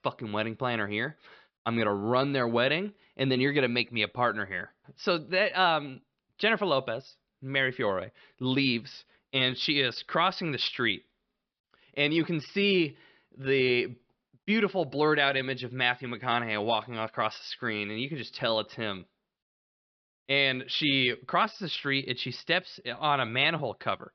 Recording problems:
high frequencies cut off; noticeable; nothing above 5.5 kHz

